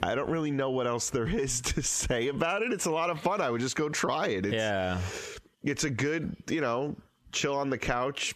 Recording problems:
squashed, flat; heavily

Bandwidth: 14 kHz